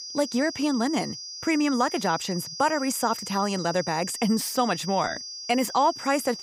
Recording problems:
high-pitched whine; loud; throughout; 5 kHz, 9 dB below the speech

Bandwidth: 15.5 kHz